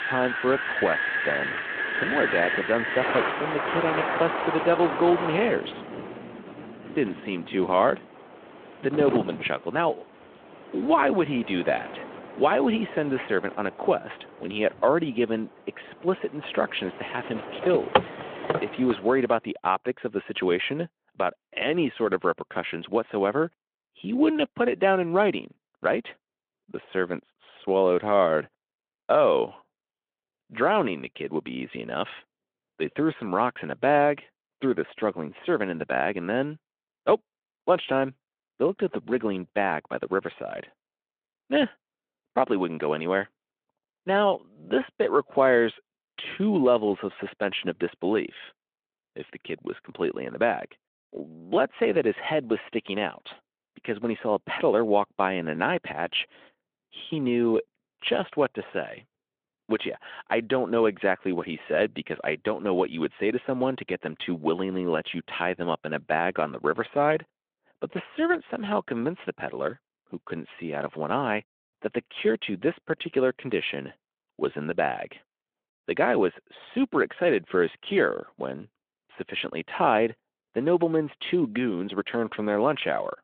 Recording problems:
phone-call audio
wind in the background; loud; until 19 s; 4 dB below the speech

